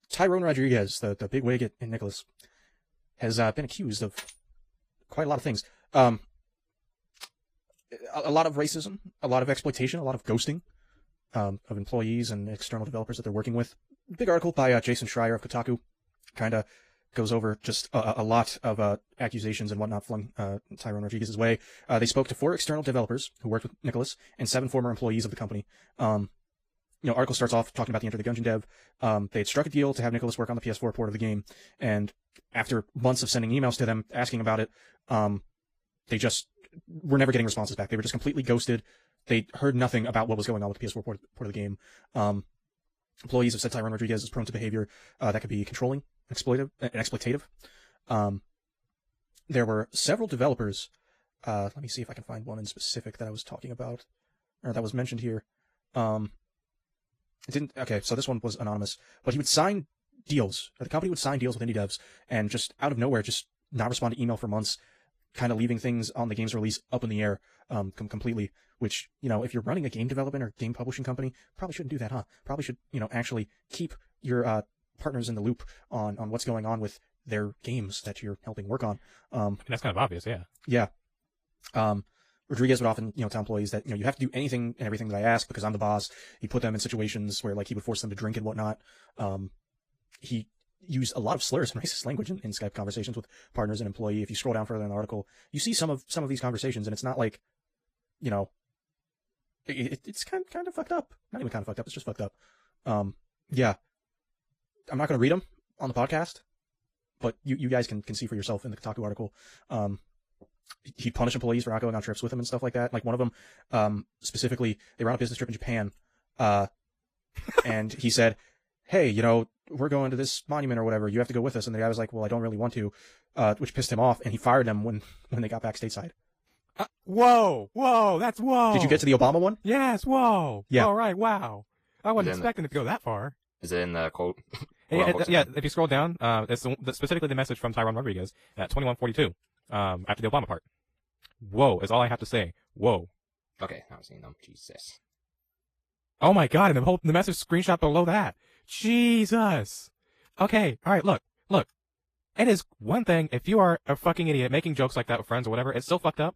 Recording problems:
wrong speed, natural pitch; too fast; 1.7 times normal speed
garbled, watery; slightly; nothing above 15 kHz

